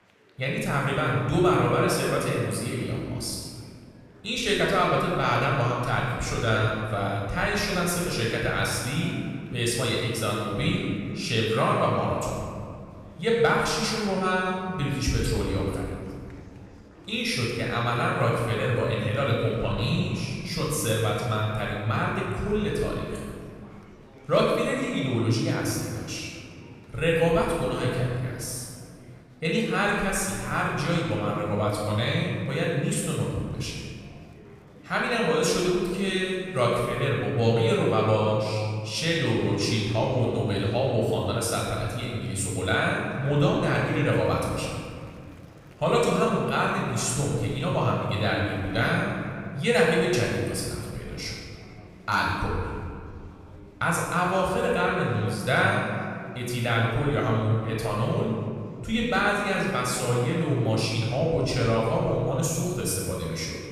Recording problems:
room echo; strong; dies away in 2 s
off-mic speech; far
murmuring crowd; faint; throughout; 25 dB below the speech

